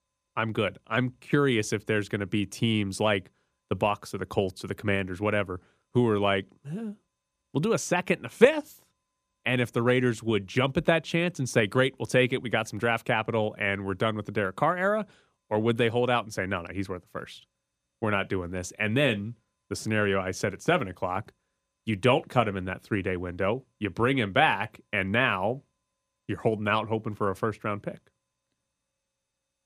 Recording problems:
none

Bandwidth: 15 kHz